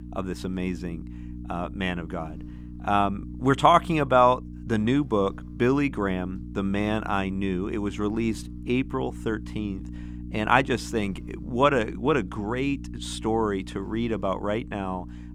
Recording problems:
electrical hum; faint; throughout; 60 Hz, 20 dB below the speech

